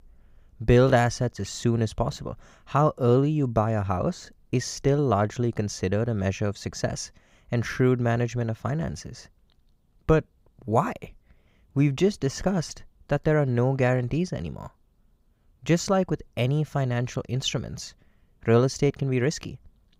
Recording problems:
none

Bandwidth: 15.5 kHz